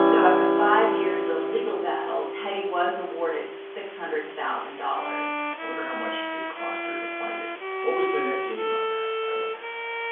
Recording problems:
off-mic speech; far
room echo; noticeable; dies away in 0.5 s
phone-call audio; nothing above 3 kHz
background music; very loud; throughout; 1 dB above the speech
hiss; noticeable; throughout; 15 dB below the speech

